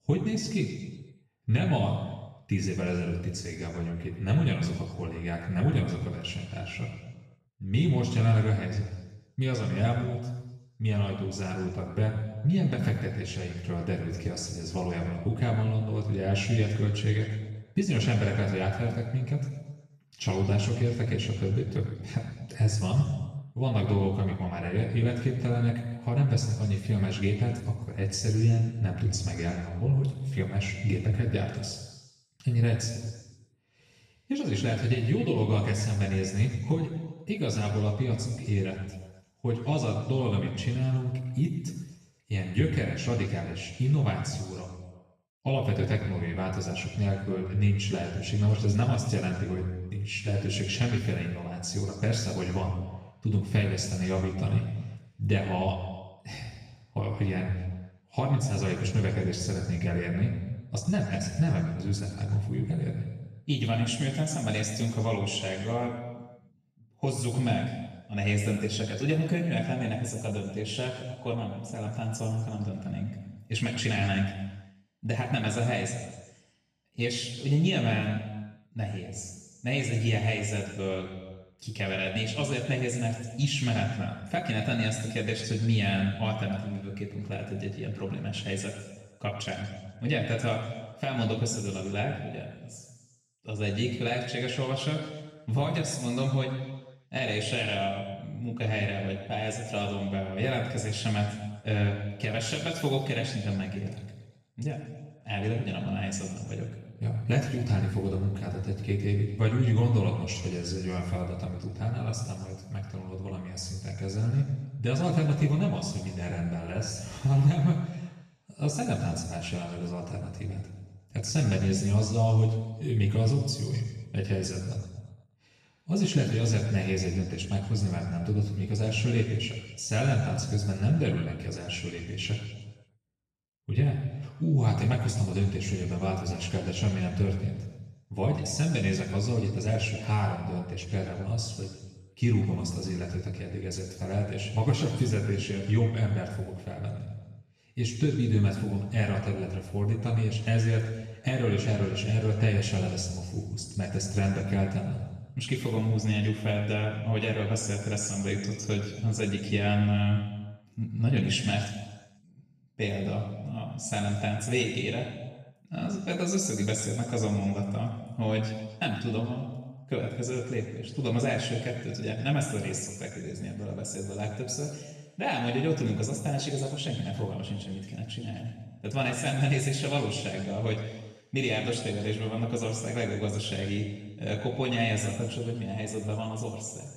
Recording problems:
off-mic speech; far
room echo; noticeable; dies away in 1.1 s

